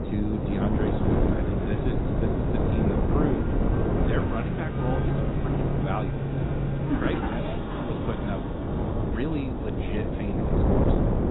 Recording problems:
garbled, watery; badly; nothing above 4 kHz
wind noise on the microphone; heavy; 3 dB above the speech
traffic noise; loud; throughout; 1 dB below the speech

